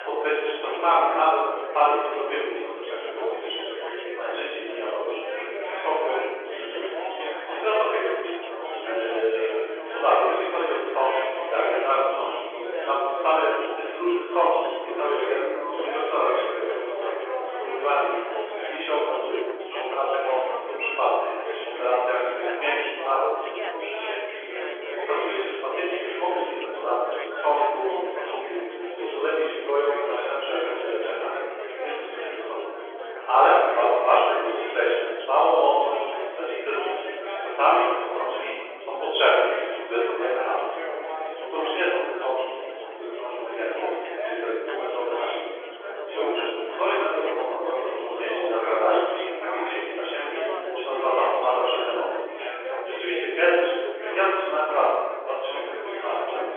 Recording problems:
room echo; strong; dies away in 1.2 s
off-mic speech; far
phone-call audio; nothing above 3.5 kHz
chatter from many people; loud; throughout; 7 dB below the speech

